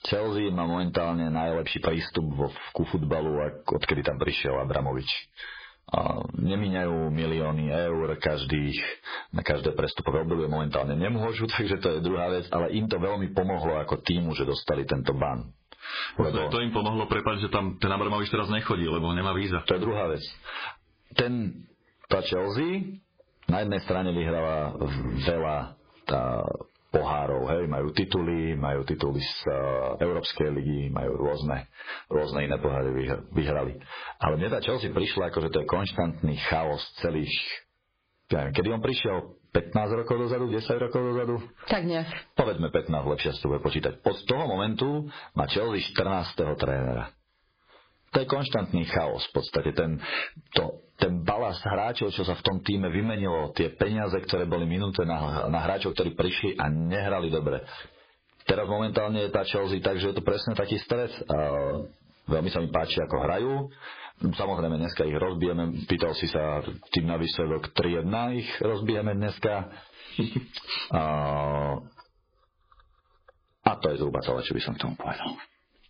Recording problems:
garbled, watery; badly; nothing above 5 kHz
distortion; slight; 10 dB below the speech
squashed, flat; somewhat

